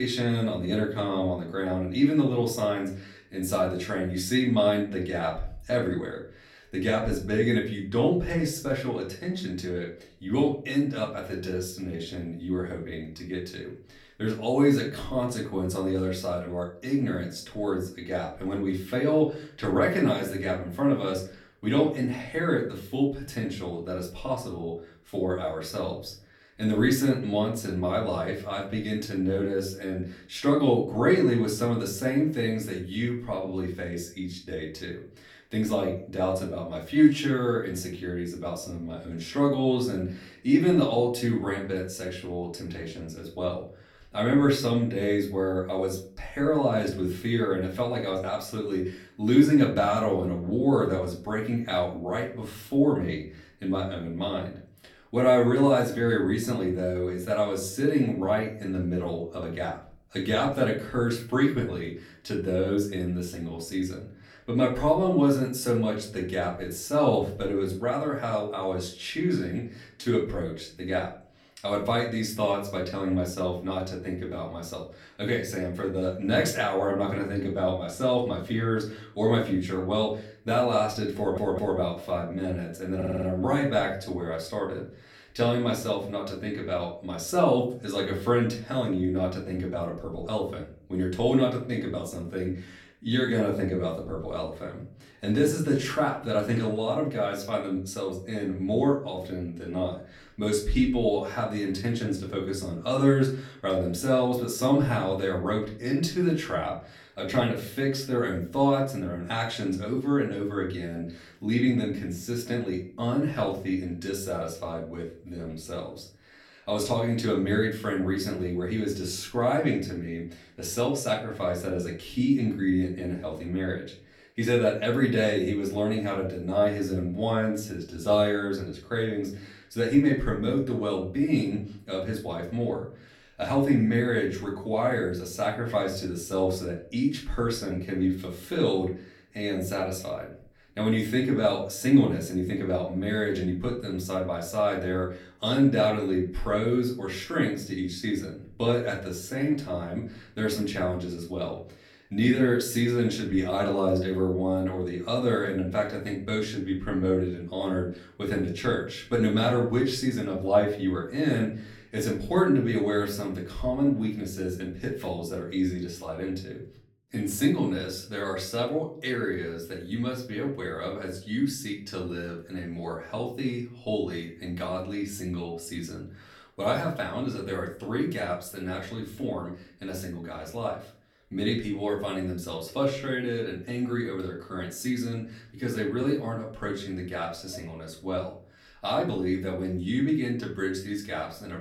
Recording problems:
off-mic speech; far
room echo; slight; dies away in 0.4 s
abrupt cut into speech; at the start
audio stuttering; at 1:21 and at 1:23

